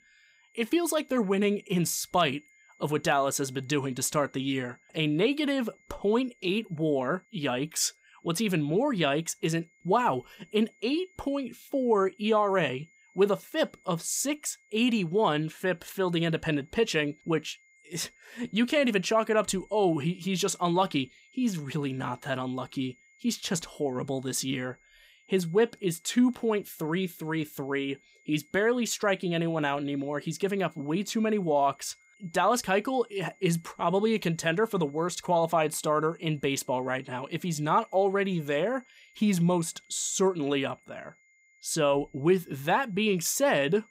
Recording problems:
high-pitched whine; faint; throughout; 2 kHz, 30 dB below the speech

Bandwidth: 15.5 kHz